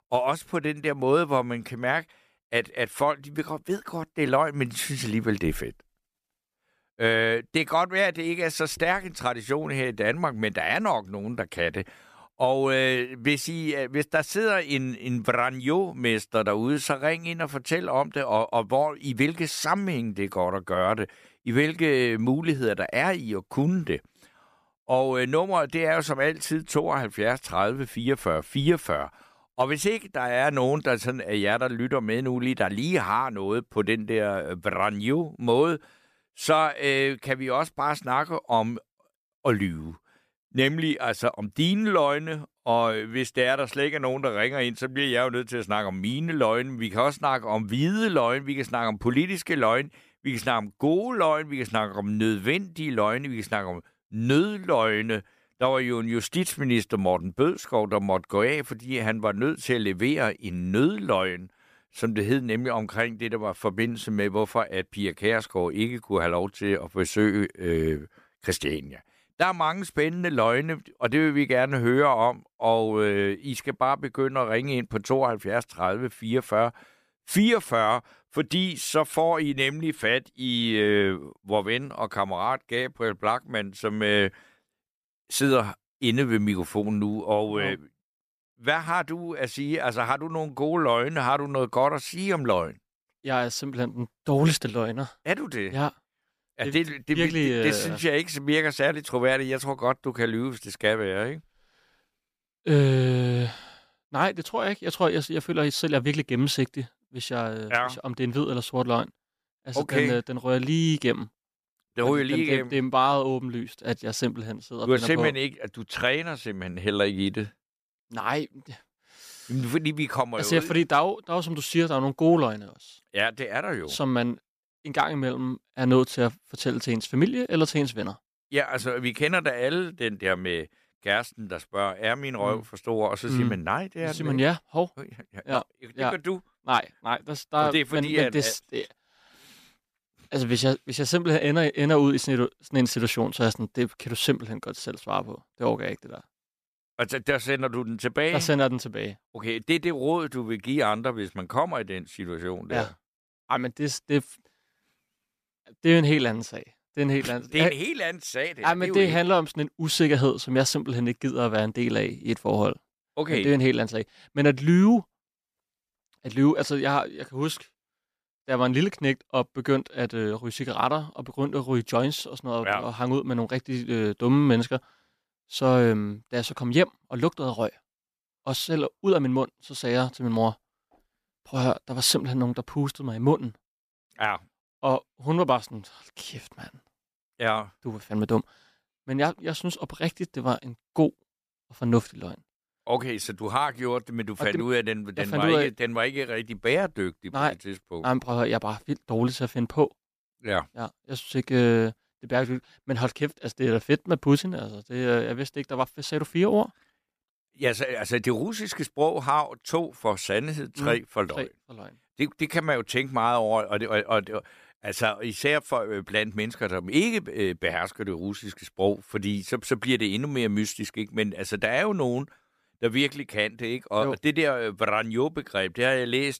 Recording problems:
none

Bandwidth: 14.5 kHz